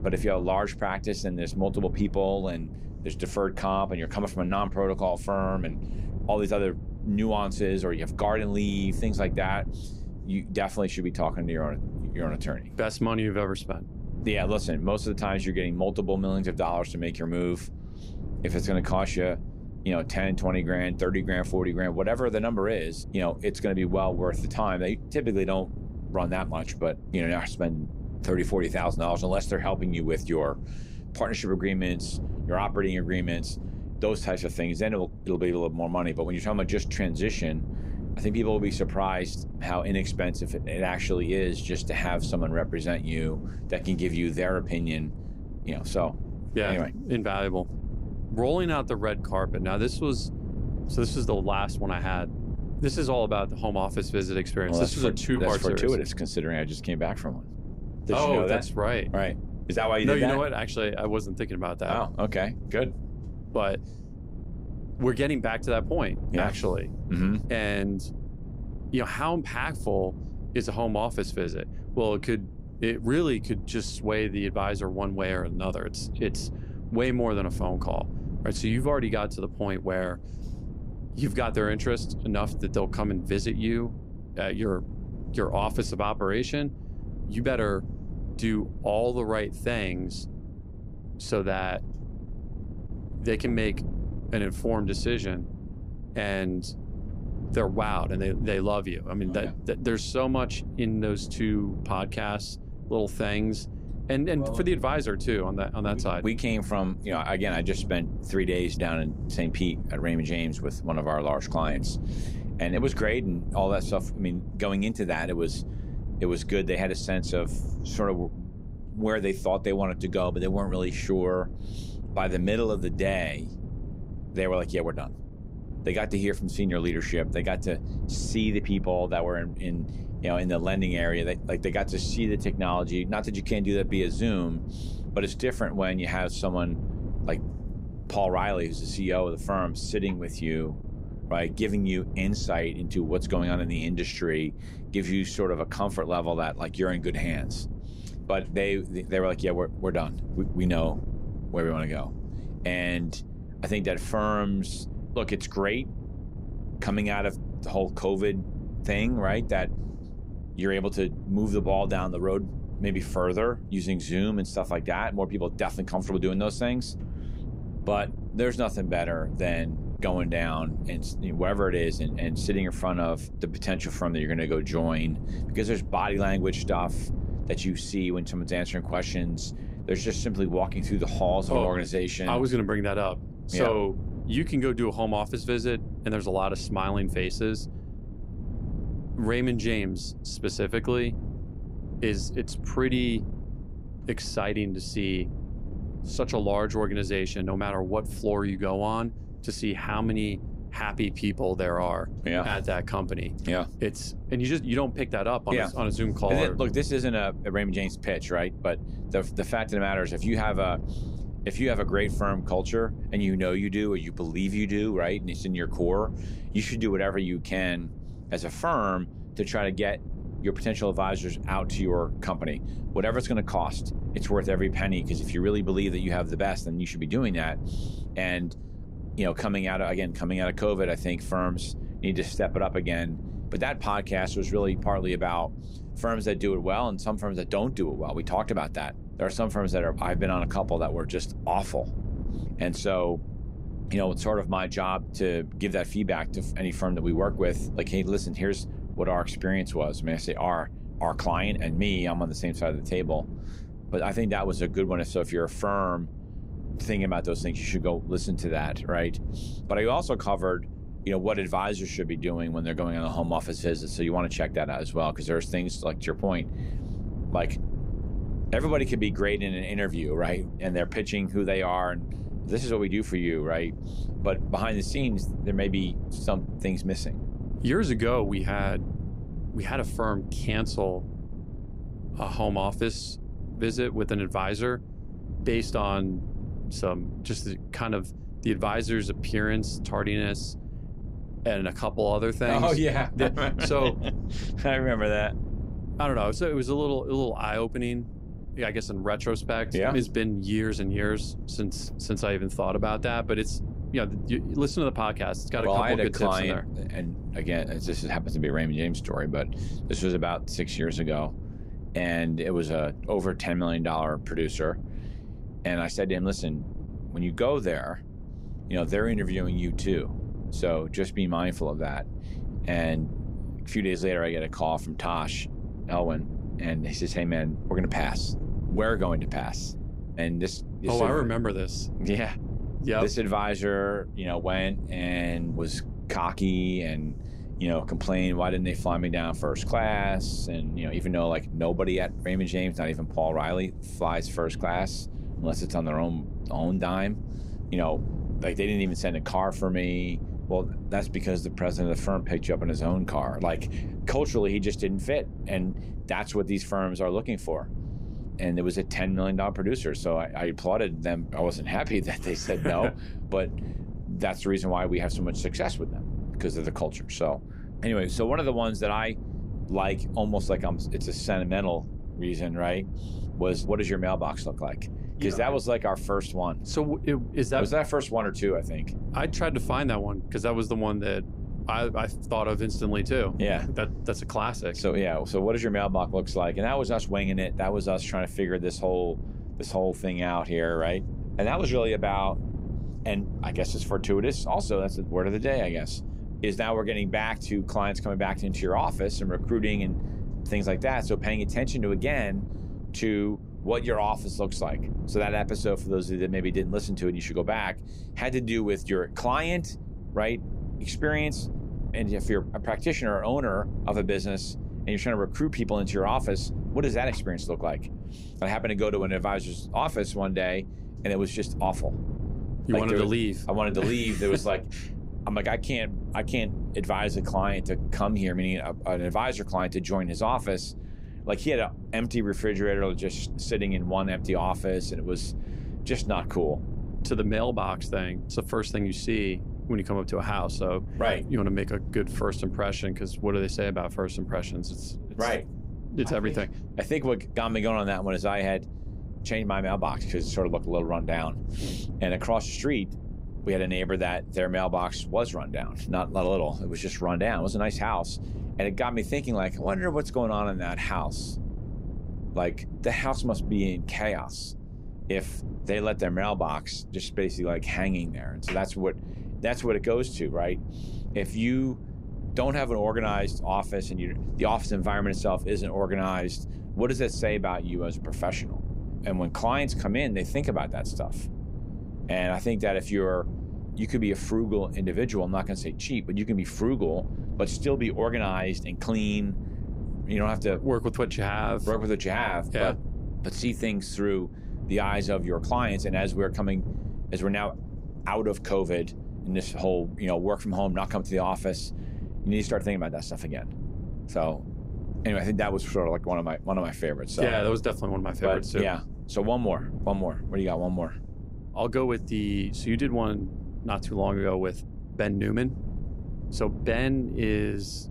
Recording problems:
wind noise on the microphone; occasional gusts; 15 dB below the speech

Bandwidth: 15.5 kHz